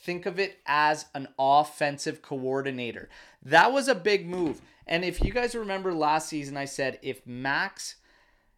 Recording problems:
none

